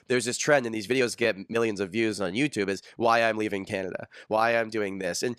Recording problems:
uneven, jittery; strongly; from 1 to 5 s

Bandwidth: 14.5 kHz